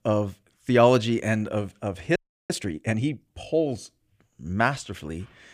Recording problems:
audio freezing; at 2 s

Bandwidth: 15 kHz